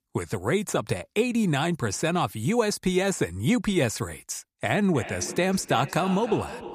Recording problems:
echo of what is said; noticeable; from 5 s on; 310 ms later, 15 dB below the speech

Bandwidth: 15 kHz